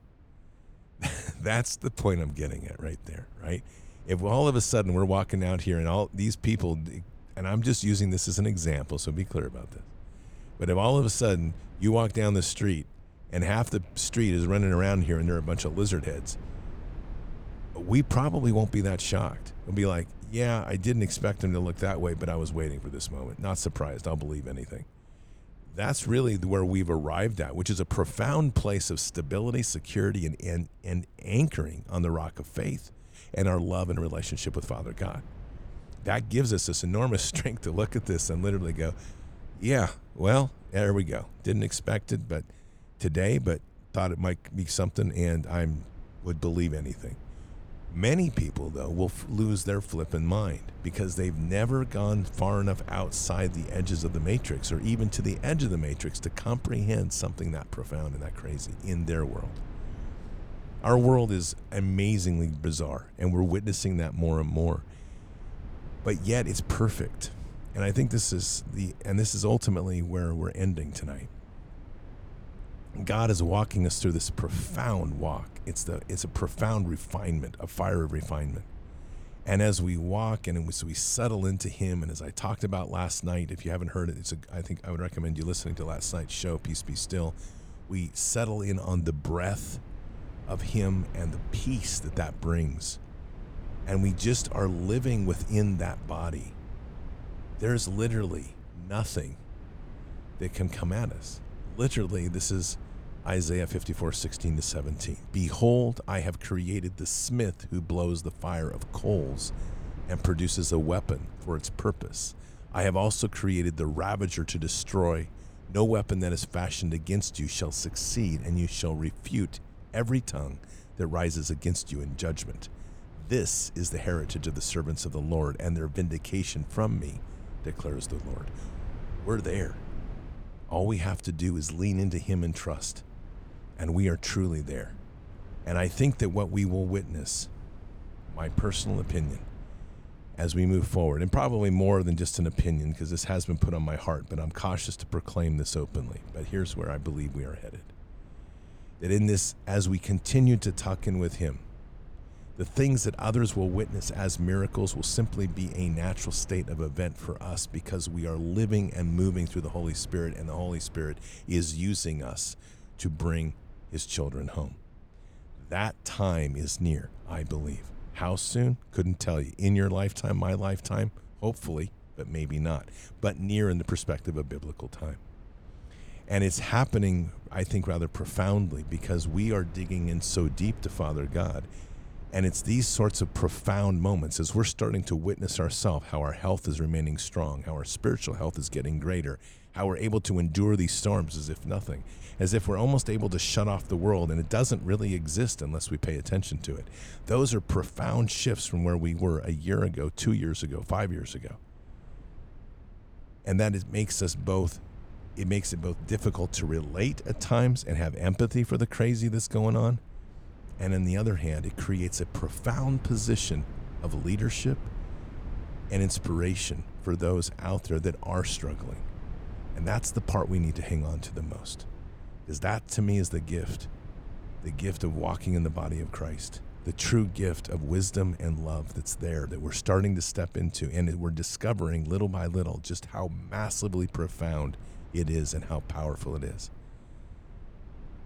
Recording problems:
low rumble; faint; throughout; 20 dB below the speech

